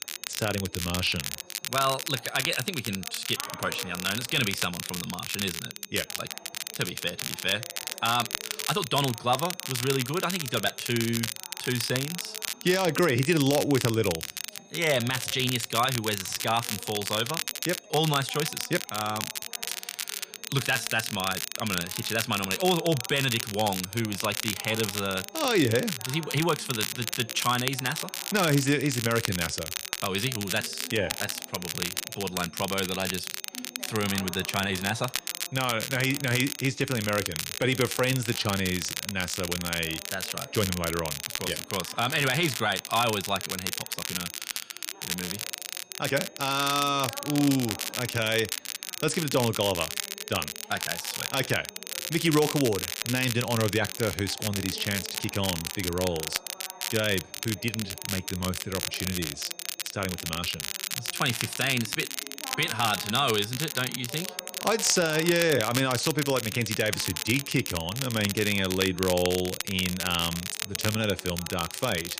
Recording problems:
crackle, like an old record; loud; 4 dB below the speech
high-pitched whine; faint; throughout; 6.5 kHz, 25 dB below the speech
background chatter; faint; throughout; 2 voices, 20 dB below the speech

